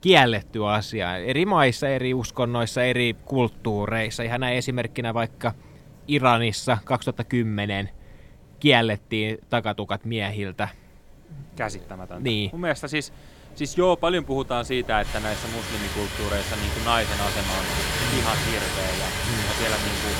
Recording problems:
rain or running water; loud; throughout; 2 dB below the speech

